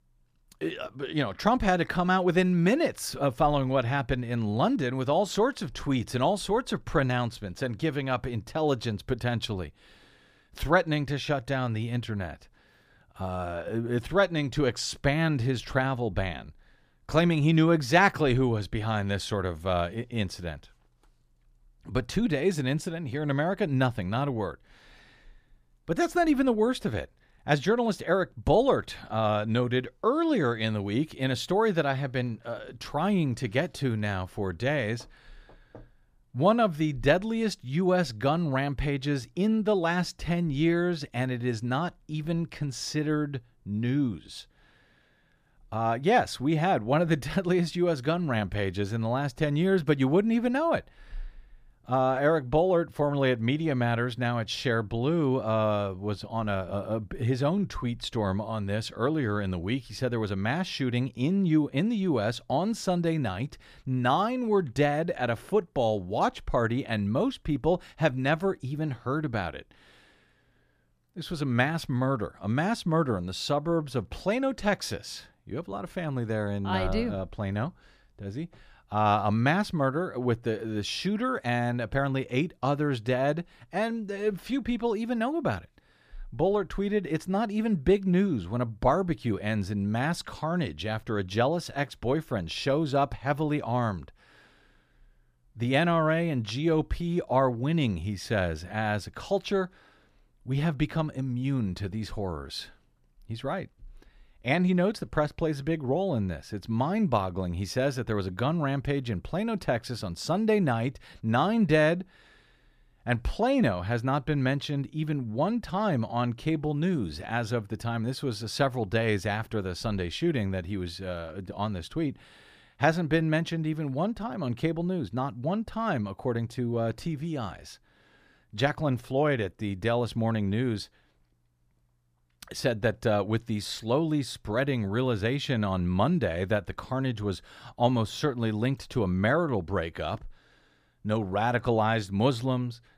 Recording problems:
none

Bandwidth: 15 kHz